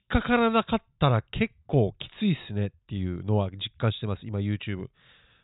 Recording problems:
high frequencies cut off; severe; nothing above 4 kHz

